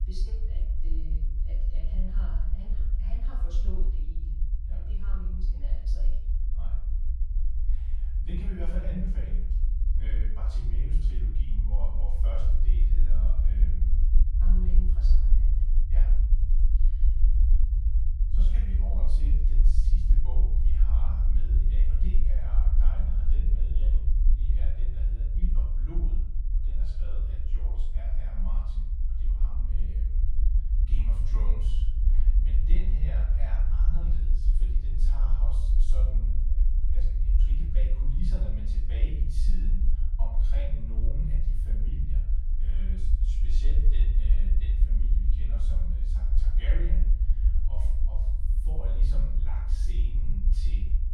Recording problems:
off-mic speech; far
room echo; noticeable; dies away in 0.6 s
low rumble; loud; throughout; 2 dB below the speech

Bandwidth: 16 kHz